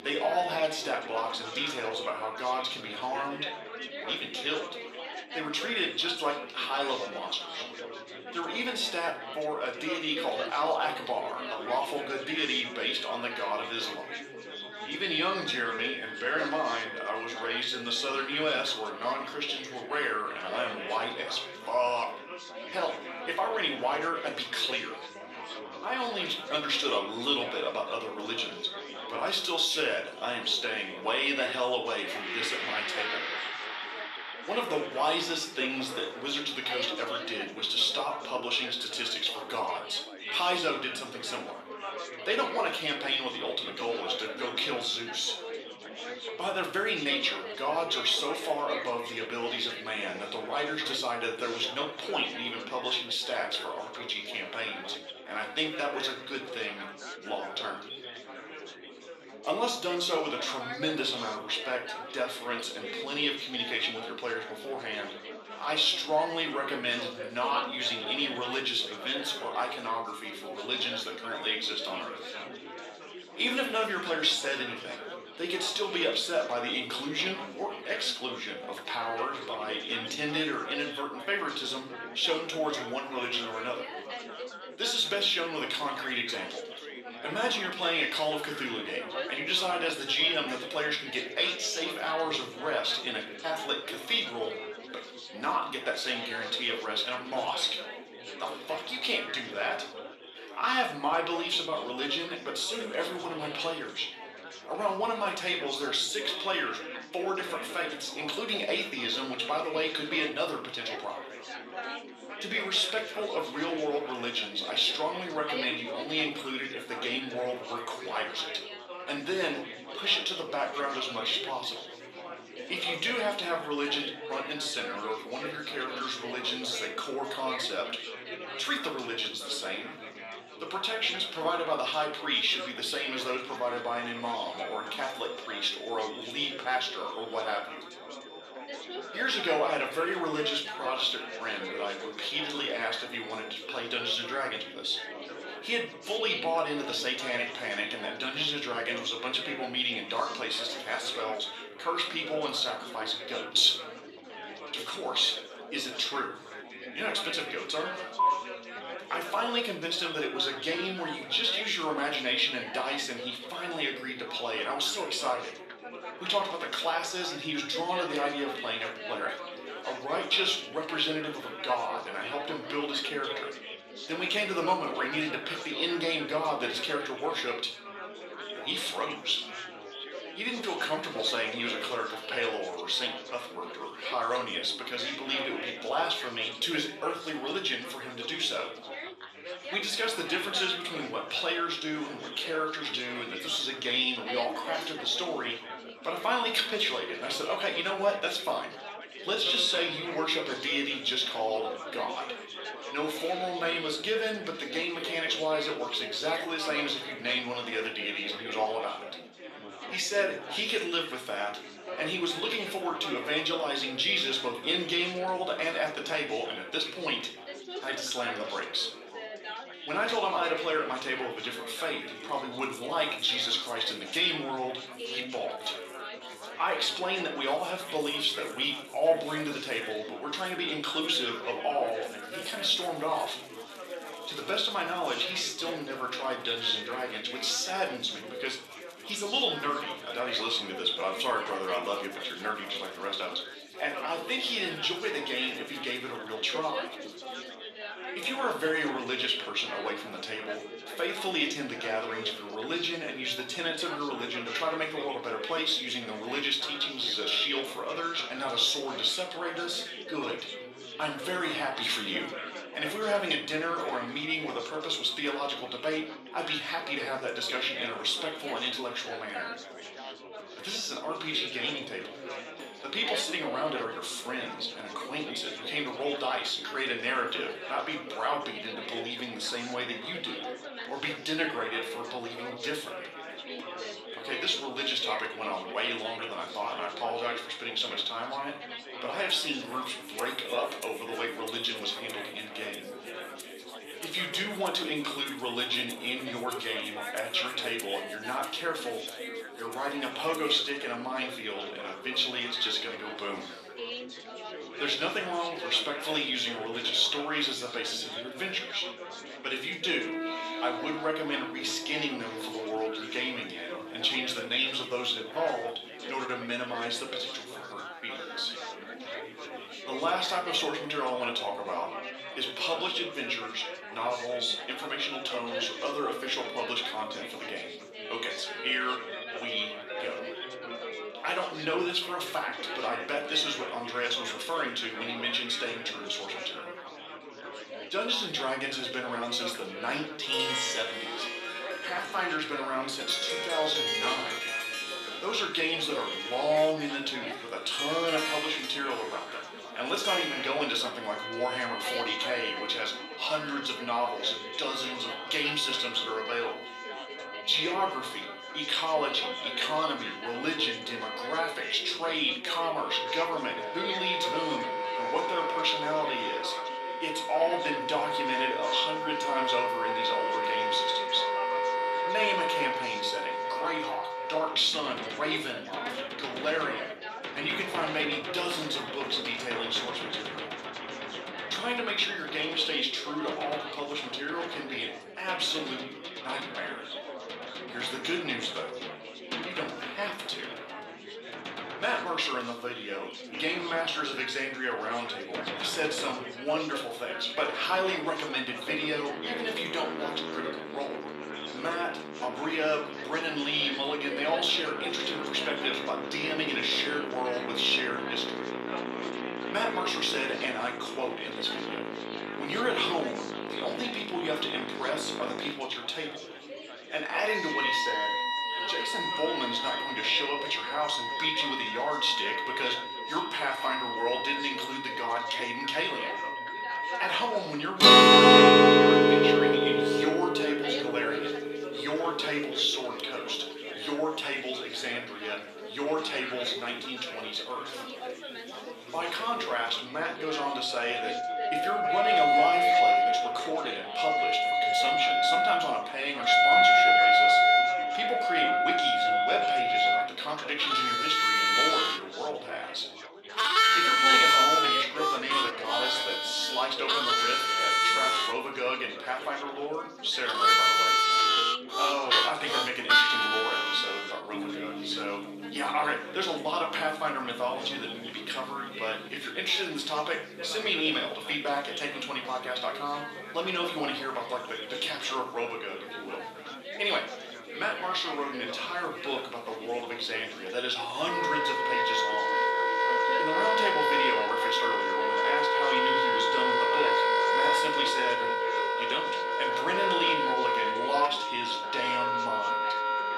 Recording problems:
thin; somewhat; fading below 300 Hz
room echo; slight; dies away in 0.4 s
off-mic speech; somewhat distant
background music; very loud; throughout; 3 dB above the speech
chatter from many people; loud; throughout; 10 dB below the speech

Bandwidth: 13.5 kHz